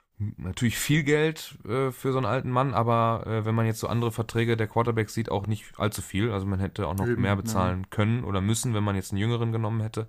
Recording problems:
none

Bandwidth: 15 kHz